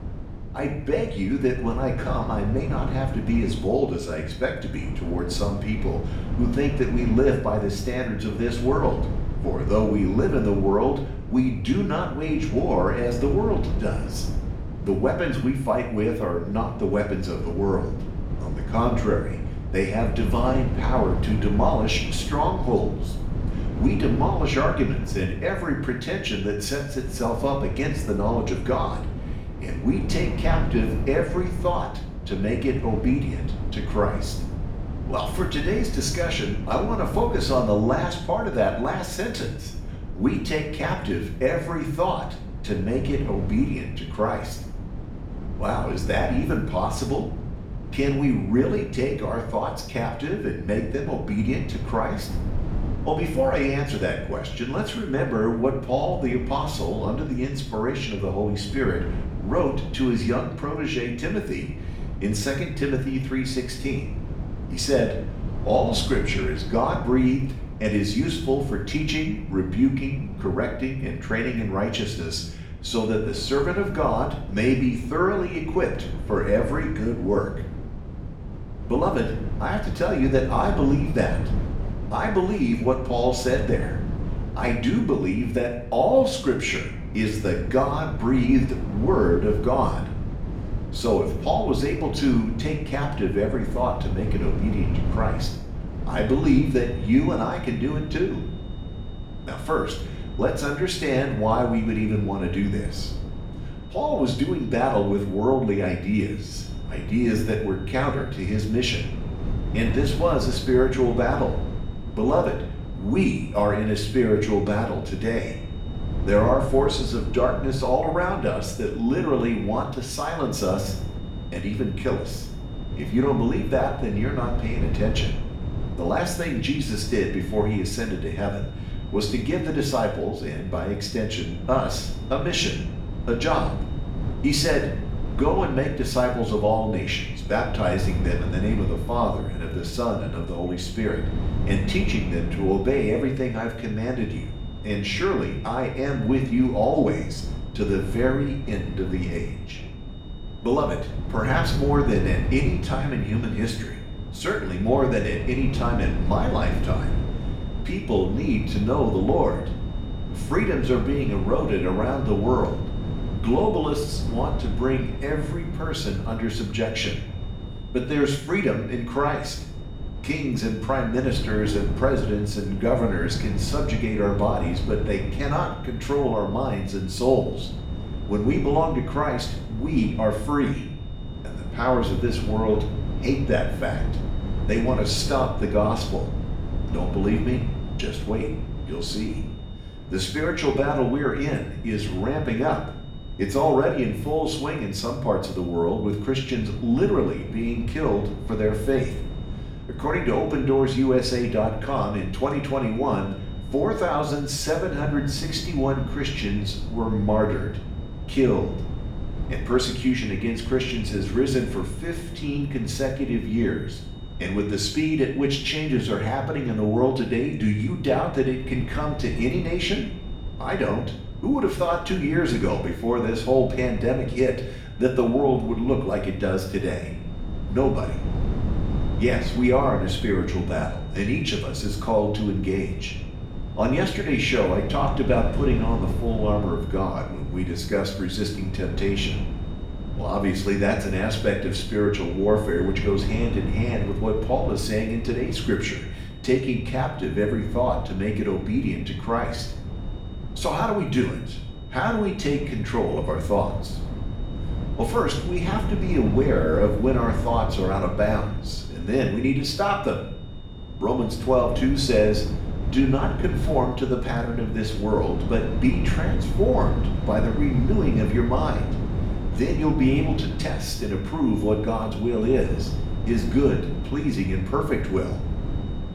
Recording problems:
off-mic speech; far
room echo; noticeable; dies away in 0.6 s
wind noise on the microphone; occasional gusts; 15 dB below the speech
high-pitched whine; faint; from 1:36 on; 3.5 kHz, 25 dB below the speech

